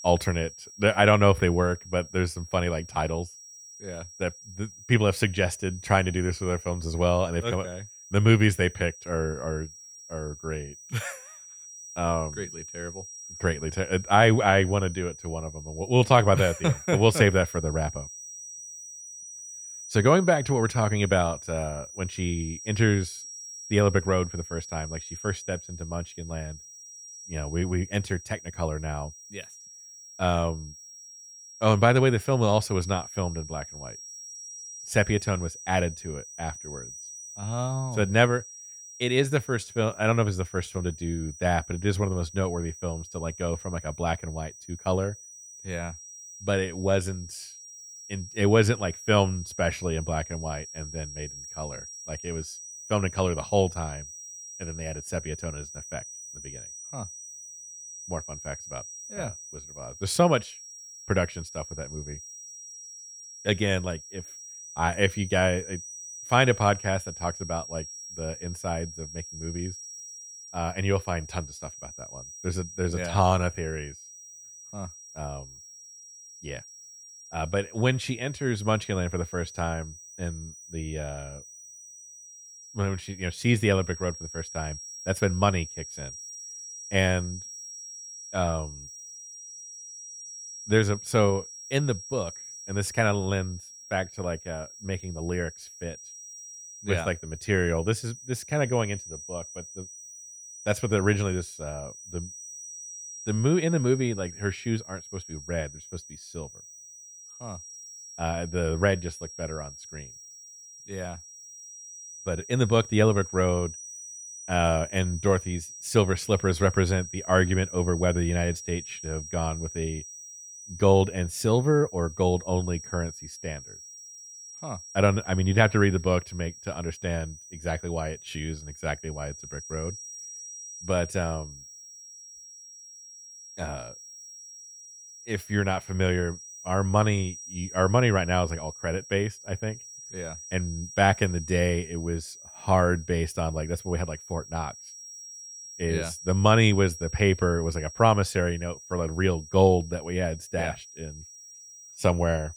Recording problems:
high-pitched whine; noticeable; throughout; 5.5 kHz, 15 dB below the speech

